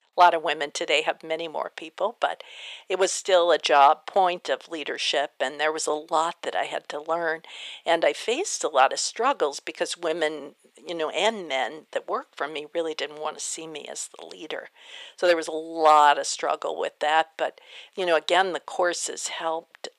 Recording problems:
thin; very; fading below 450 Hz

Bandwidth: 15 kHz